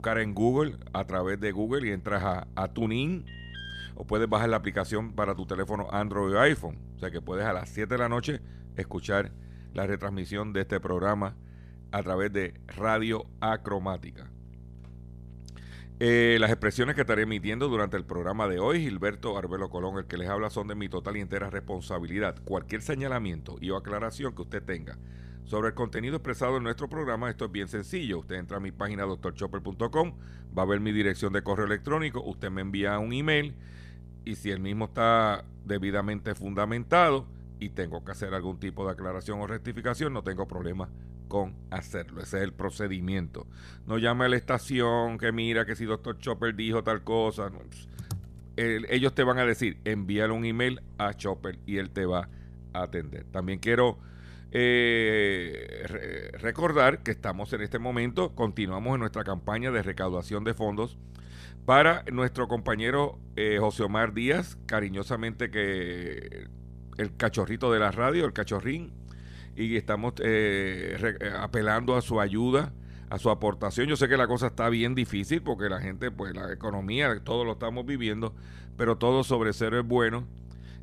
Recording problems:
electrical hum; faint; throughout; 60 Hz, 30 dB below the speech
alarm; faint; at 3.5 s; peak 10 dB below the speech
keyboard typing; faint; at 48 s; peak 10 dB below the speech

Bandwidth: 14.5 kHz